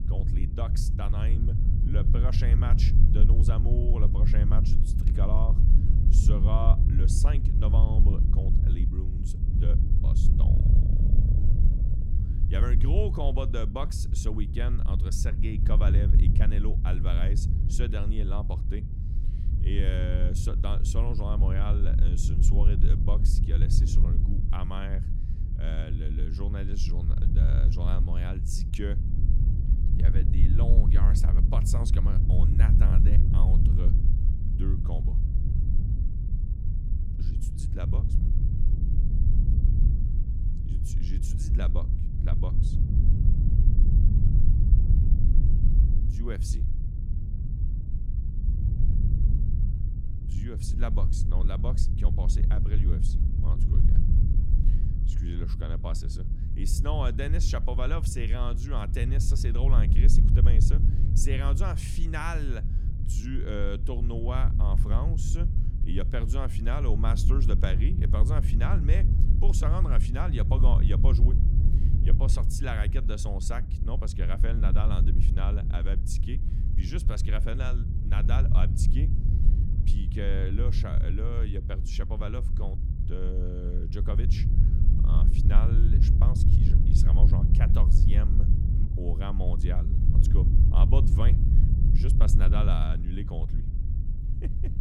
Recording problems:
low rumble; loud; throughout; 3 dB below the speech

